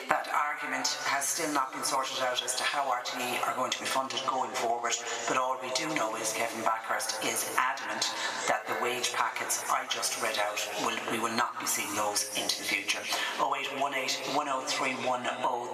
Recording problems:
thin; very; fading below 850 Hz
room echo; slight; dies away in 1.5 s
off-mic speech; somewhat distant
squashed, flat; somewhat
background chatter; noticeable; throughout; 3 voices, 15 dB below the speech

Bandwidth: 14 kHz